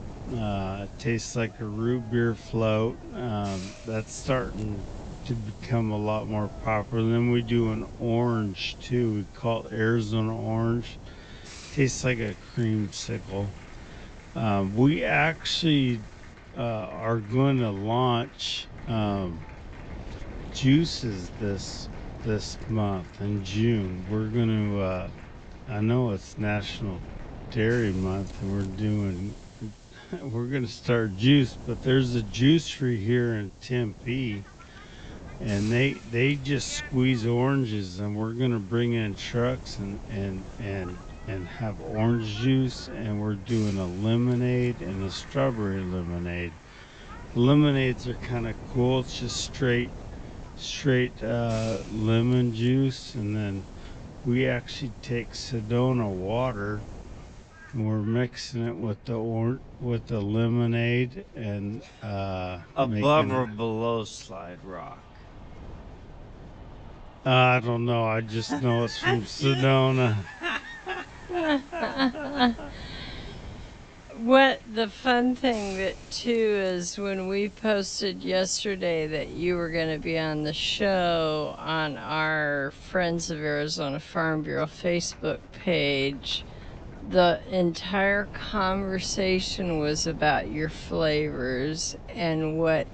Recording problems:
wrong speed, natural pitch; too slow; 0.6 times normal speed
high frequencies cut off; noticeable; nothing above 8 kHz
wind noise on the microphone; occasional gusts; 25 dB below the speech
crowd noise; faint; throughout; 25 dB below the speech
hiss; faint; until 16 s, from 28 to 58 s and from 1:09 to 1:22; 25 dB below the speech

